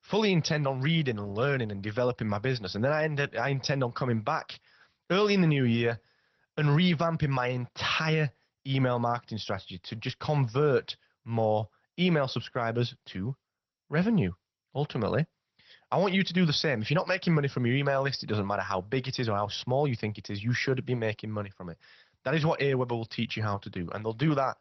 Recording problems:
garbled, watery; slightly; nothing above 6 kHz

